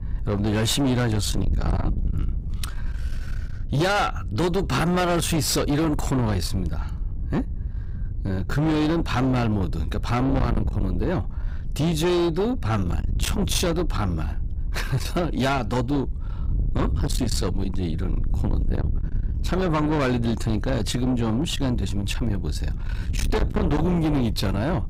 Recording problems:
distortion; heavy; 7 dB below the speech
wind noise on the microphone; occasional gusts; 10 dB below the speech

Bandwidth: 15.5 kHz